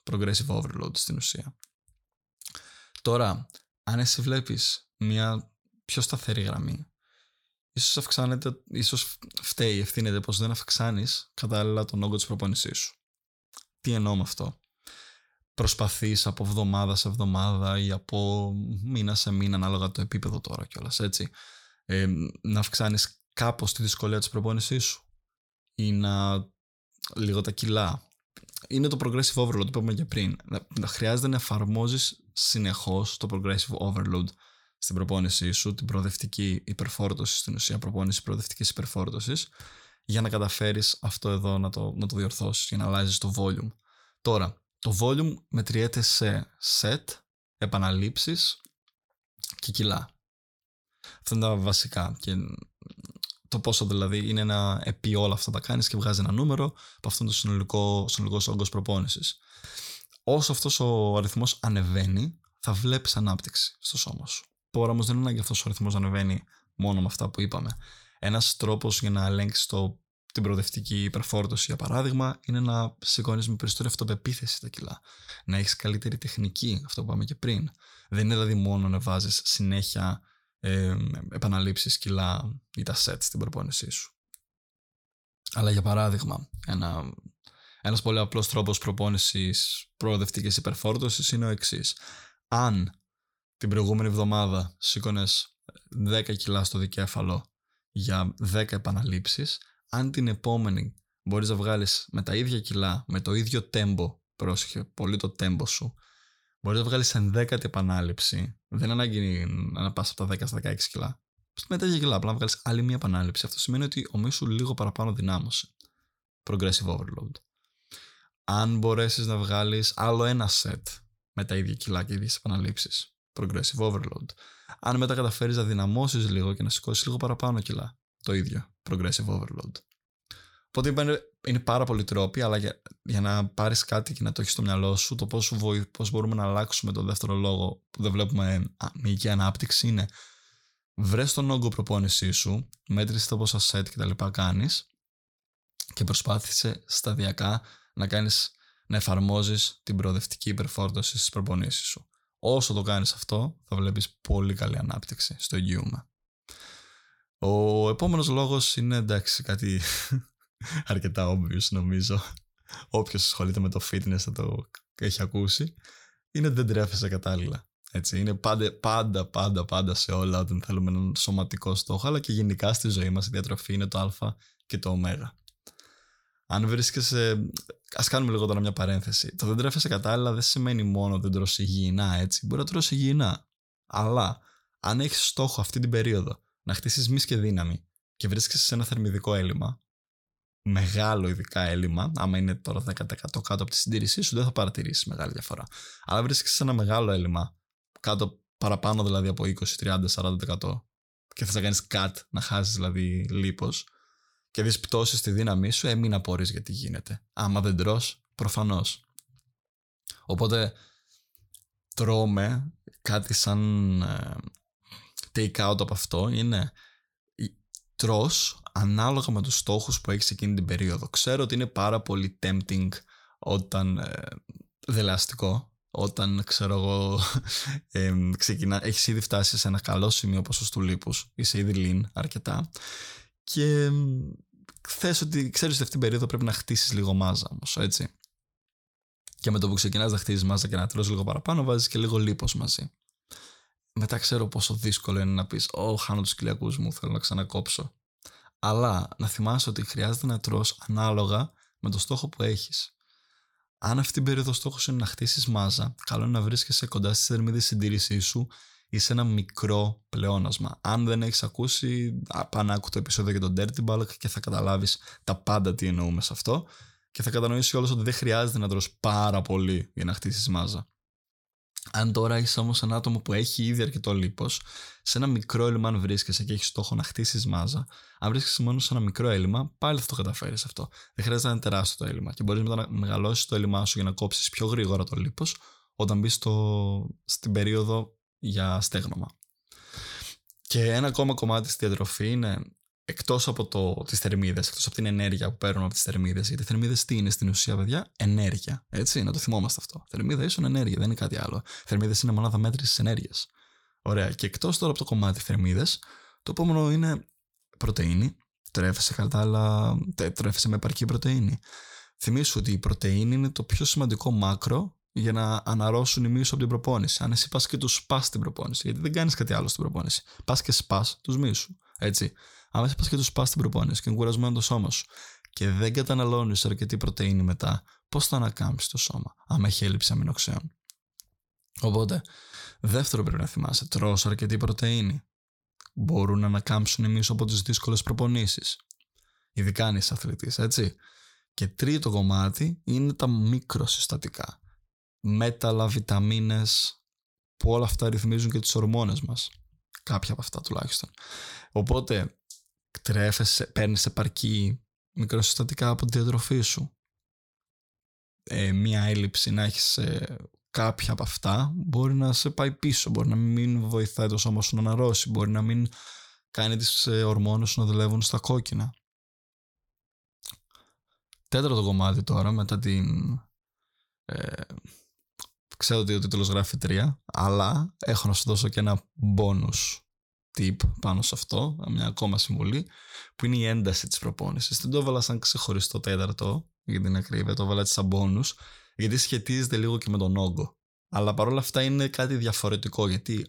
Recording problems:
none

